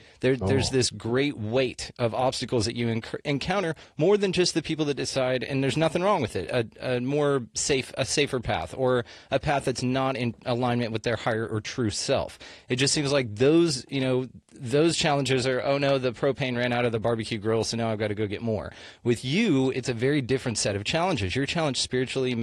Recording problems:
garbled, watery; slightly
abrupt cut into speech; at the end

